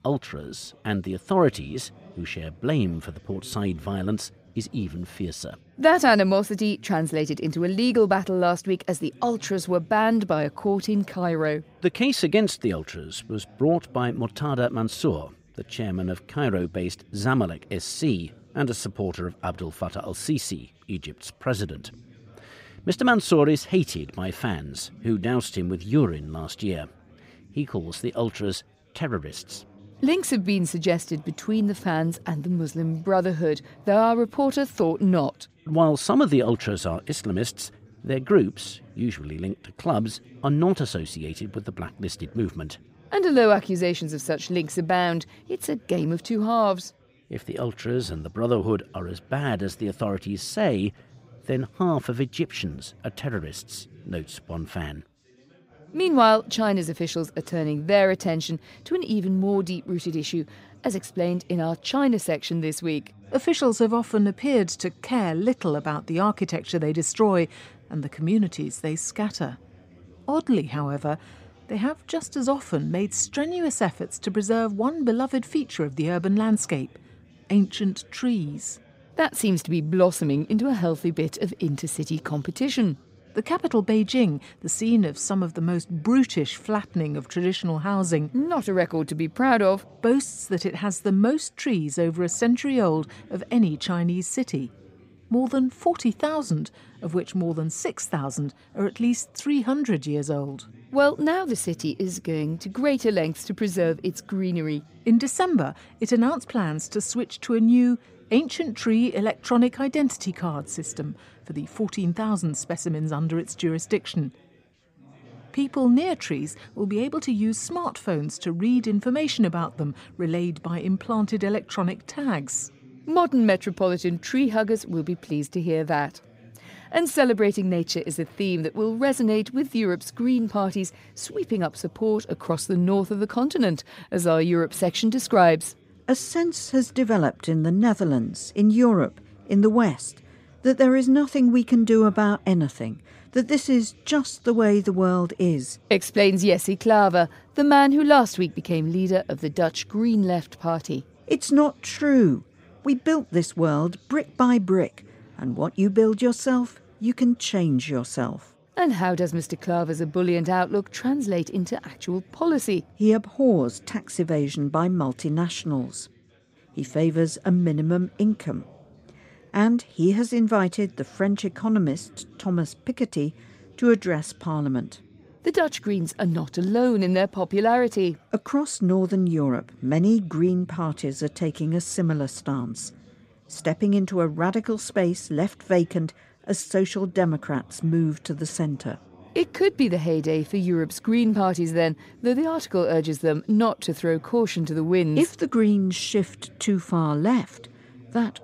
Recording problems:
background chatter; faint; throughout; 4 voices, 30 dB below the speech

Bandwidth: 15.5 kHz